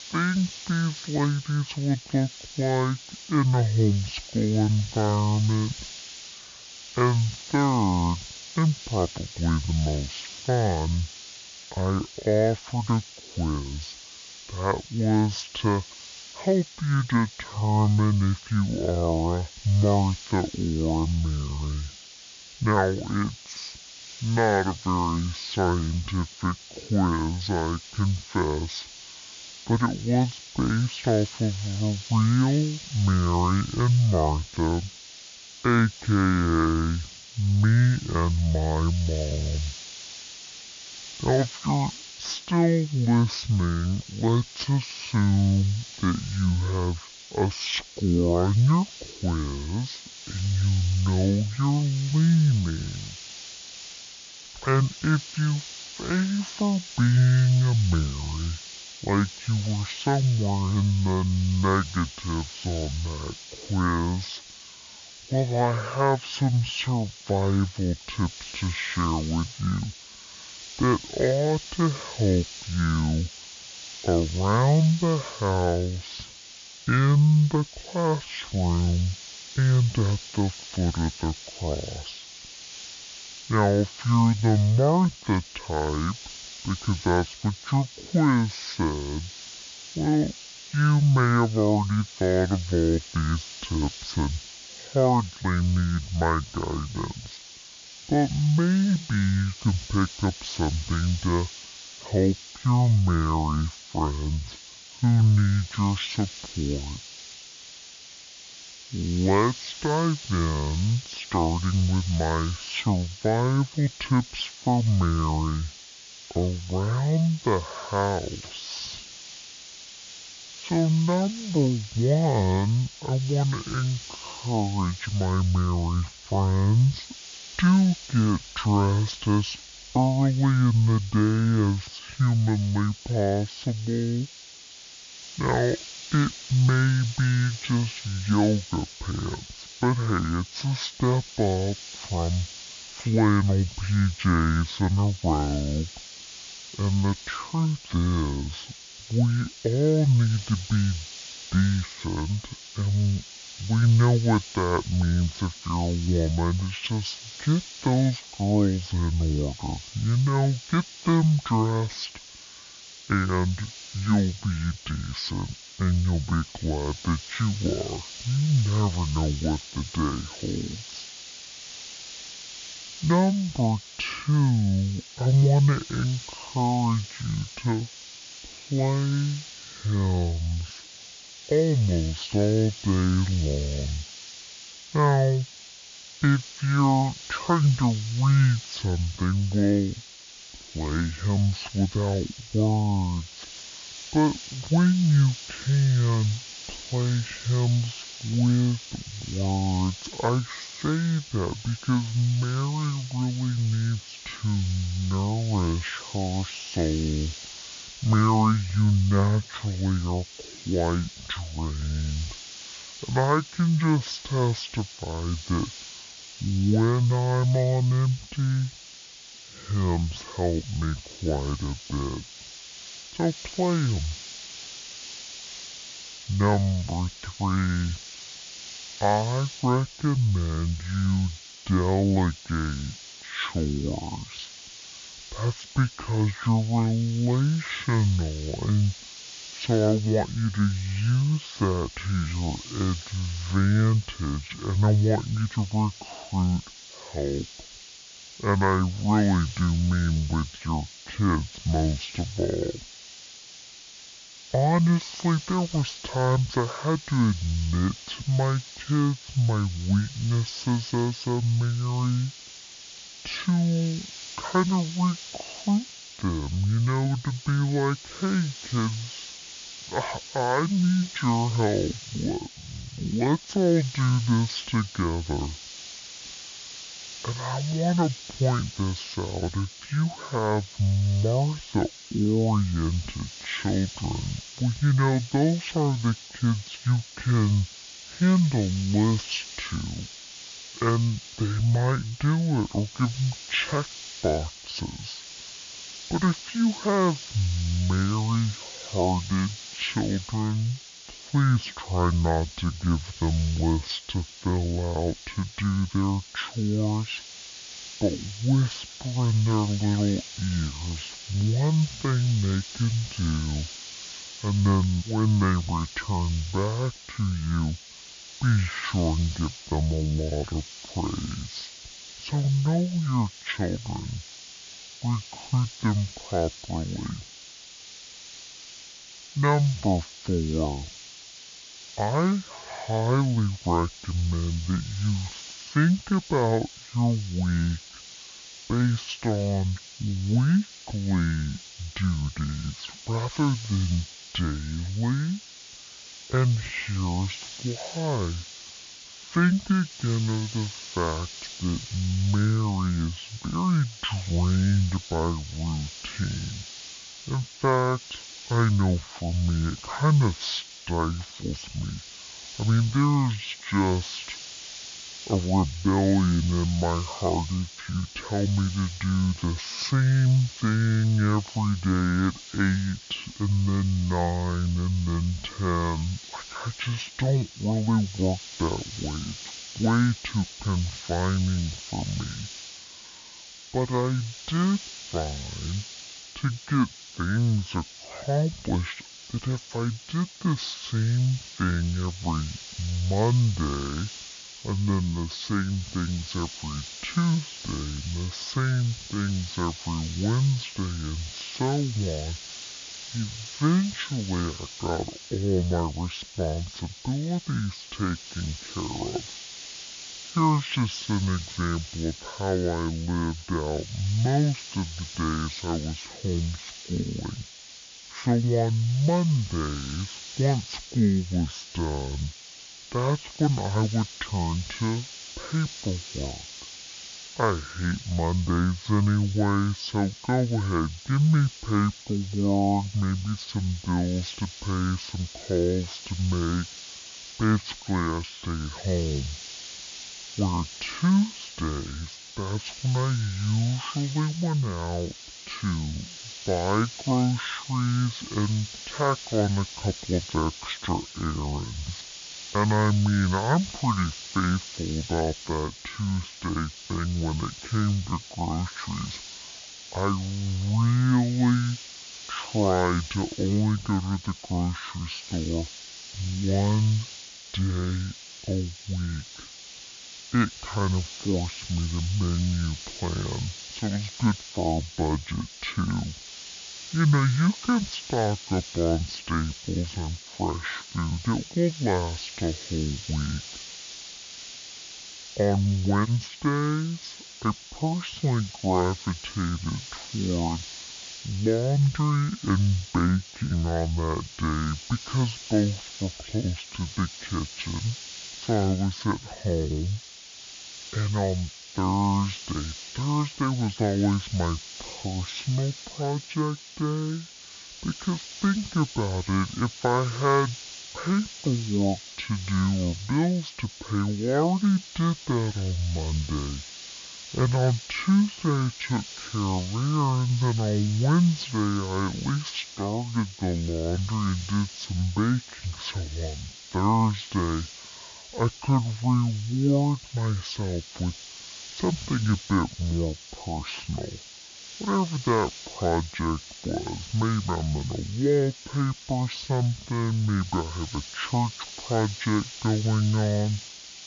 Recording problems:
wrong speed and pitch; too slow and too low; 0.5 times normal speed
hiss; noticeable; throughout; 15 dB below the speech

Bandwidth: 7 kHz